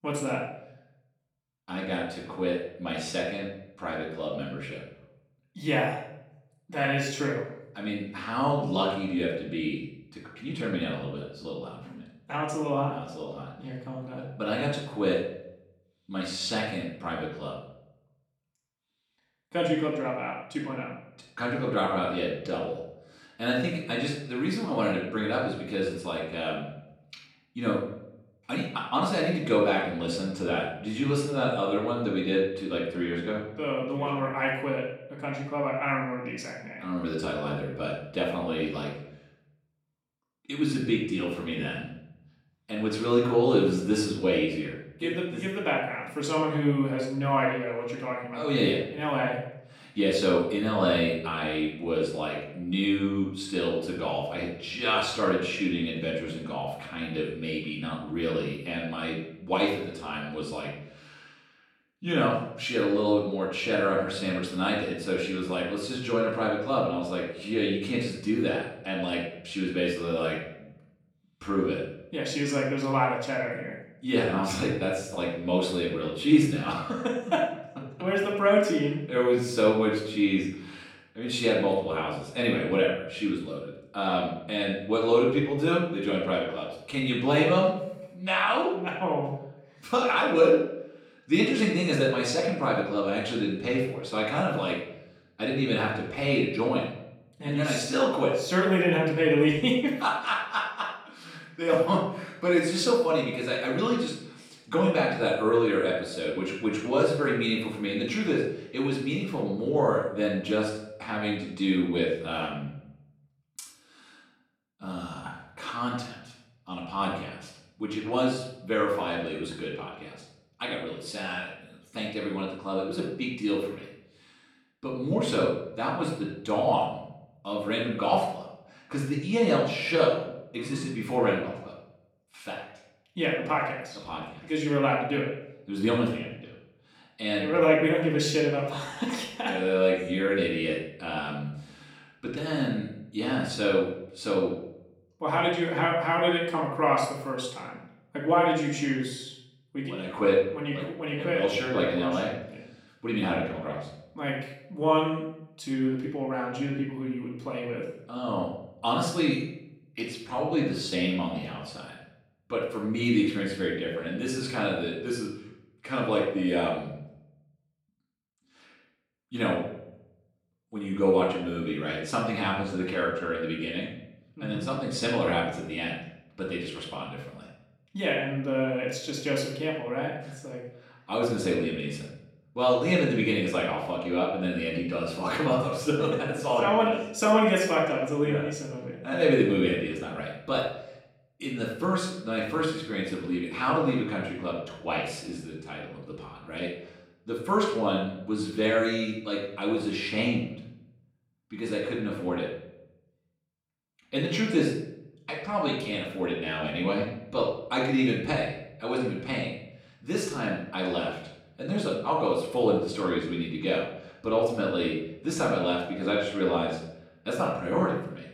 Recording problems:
off-mic speech; far
room echo; noticeable; dies away in 0.6 s

